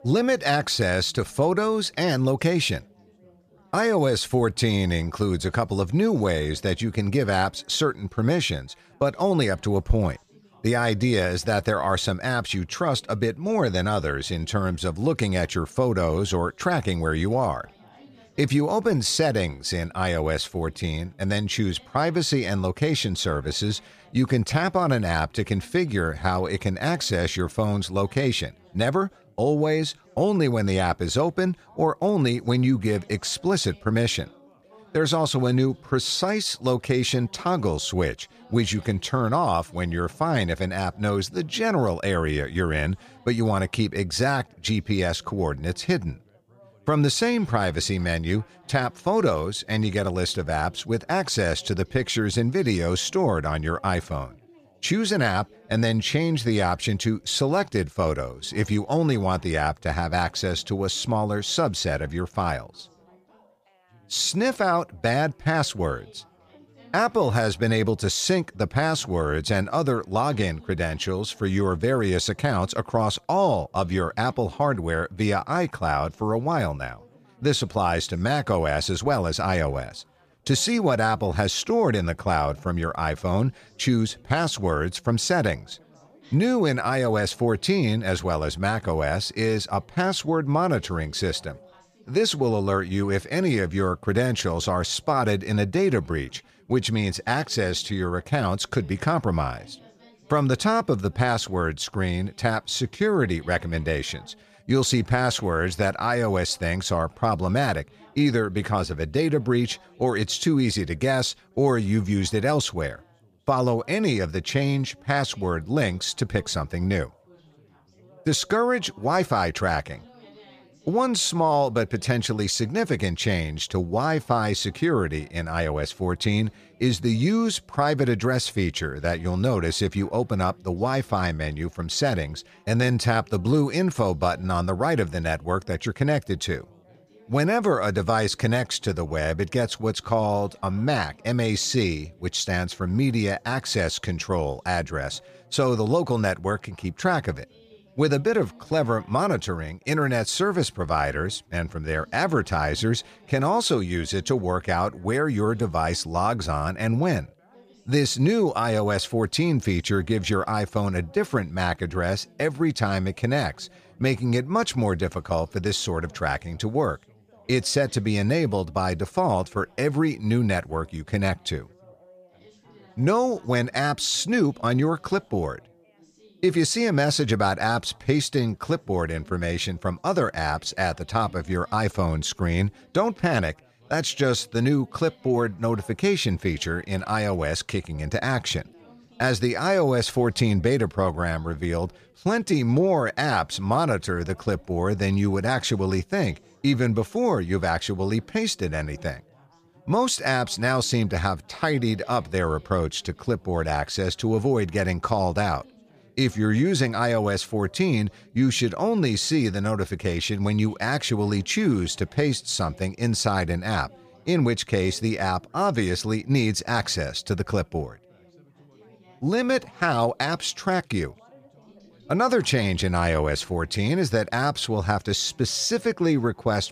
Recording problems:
background chatter; faint; throughout; 4 voices, 30 dB below the speech

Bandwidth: 15 kHz